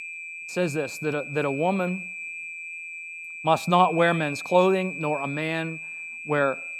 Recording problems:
high-pitched whine; loud; throughout; 2.5 kHz, 9 dB below the speech

